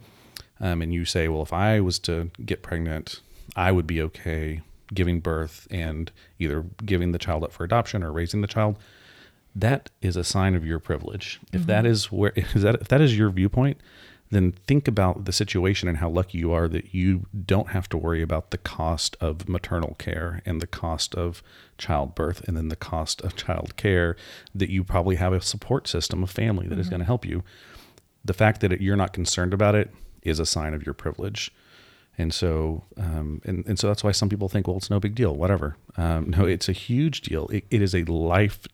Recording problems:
none

